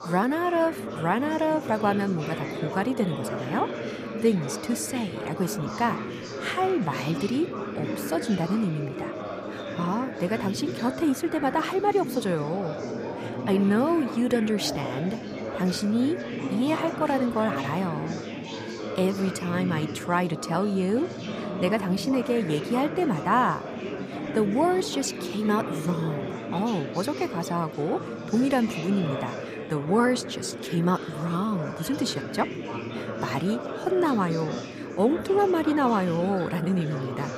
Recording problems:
chatter from many people; loud; throughout; 7 dB below the speech

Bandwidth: 14.5 kHz